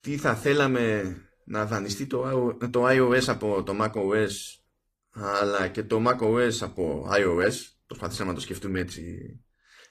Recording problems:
garbled, watery; slightly; nothing above 14.5 kHz

